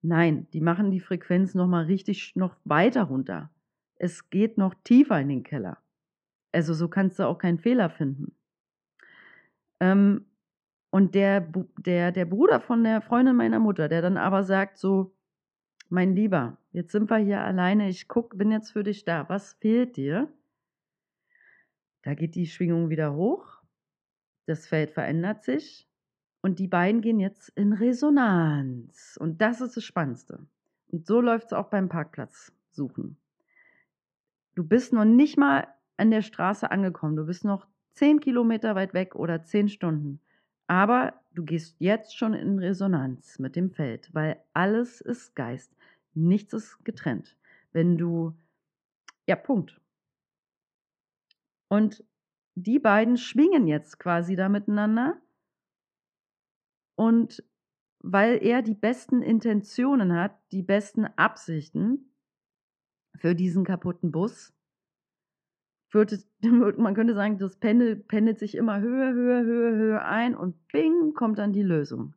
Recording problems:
muffled; very; fading above 2.5 kHz

